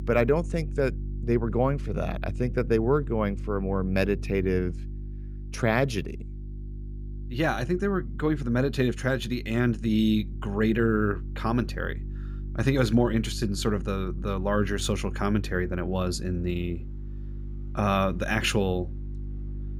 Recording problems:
electrical hum; faint; throughout; 50 Hz, 20 dB below the speech

